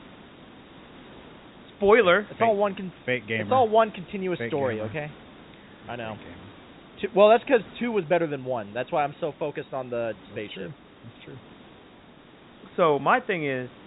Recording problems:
high frequencies cut off; severe; nothing above 4 kHz
hiss; faint; throughout; 25 dB below the speech

